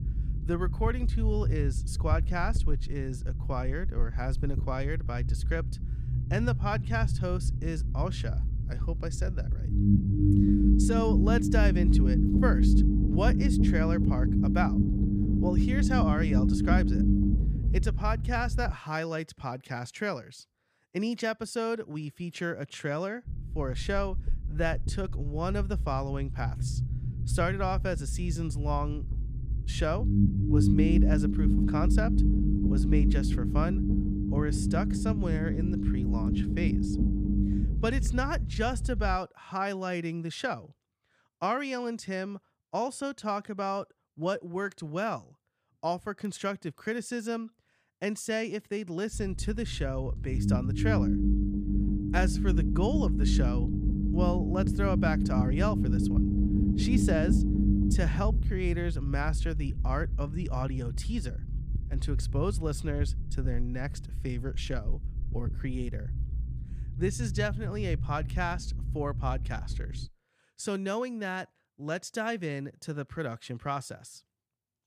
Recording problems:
low rumble; loud; until 19 s, from 23 to 39 s and from 49 s to 1:10; 2 dB below the speech

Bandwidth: 15 kHz